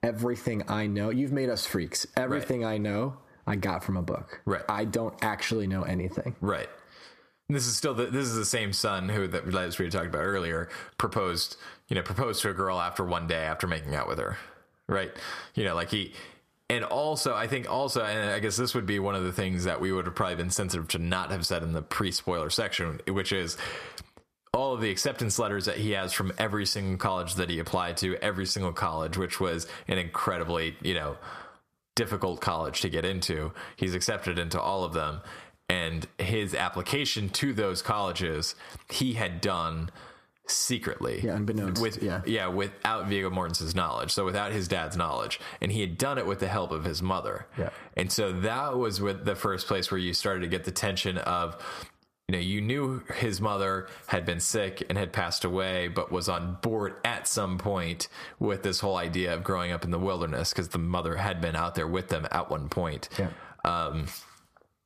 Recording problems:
squashed, flat; heavily

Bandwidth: 14.5 kHz